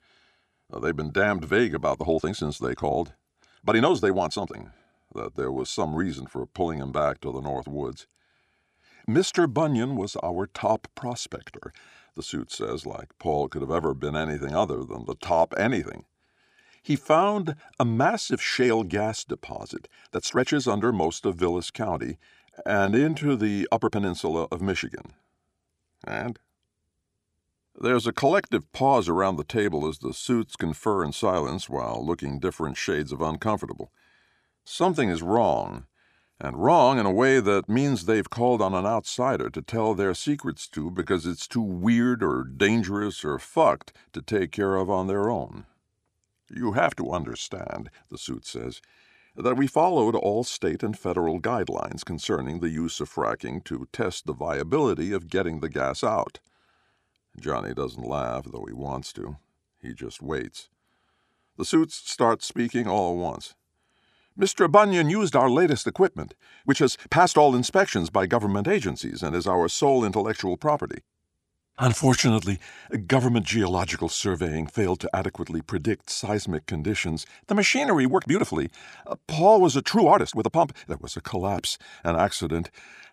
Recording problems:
uneven, jittery; strongly; from 2 s to 1:21

